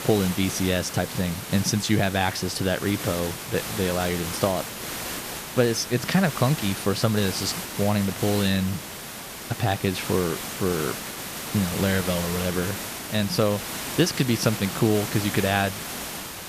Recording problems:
hiss; loud; throughout; 7 dB below the speech

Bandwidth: 14.5 kHz